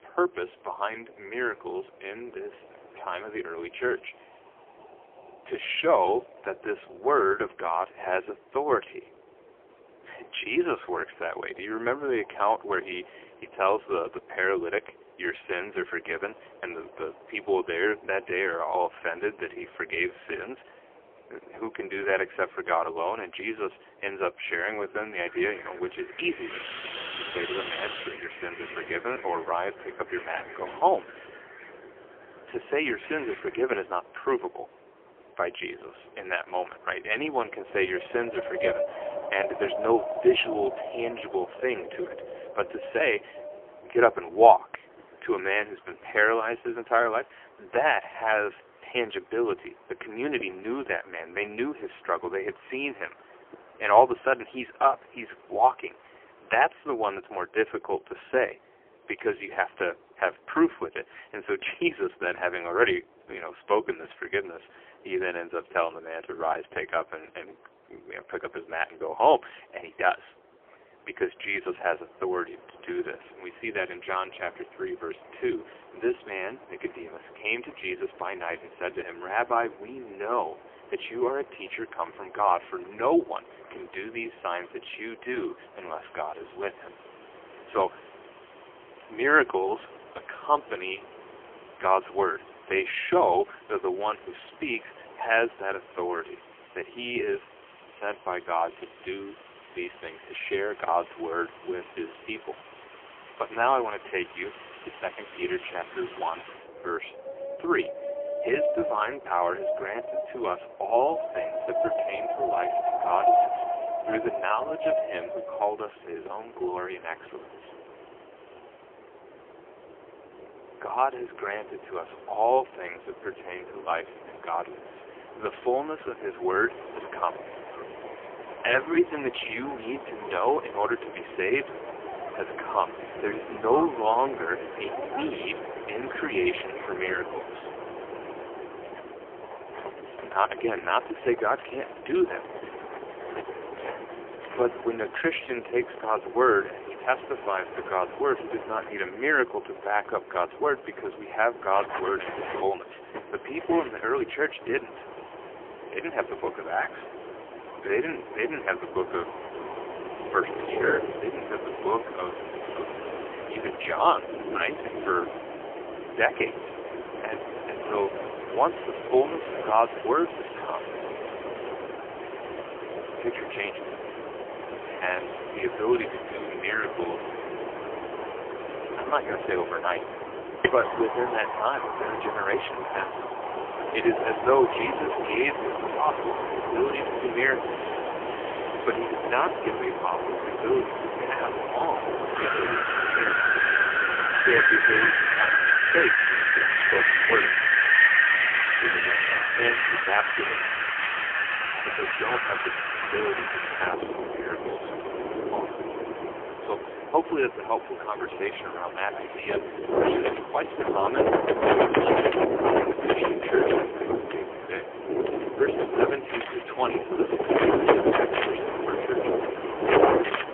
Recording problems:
phone-call audio; poor line; nothing above 3 kHz
wind in the background; very loud; throughout; 1 dB above the speech

